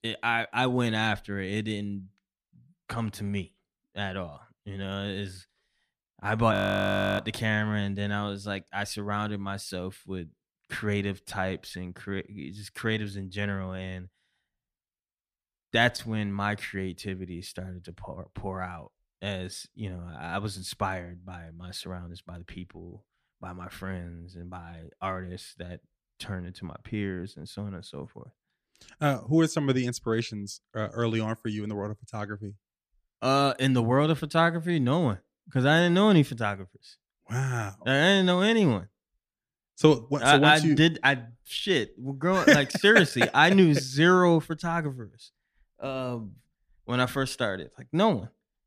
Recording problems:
audio freezing; at 6.5 s for 0.5 s

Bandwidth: 14.5 kHz